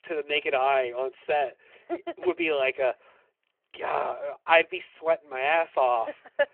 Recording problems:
phone-call audio

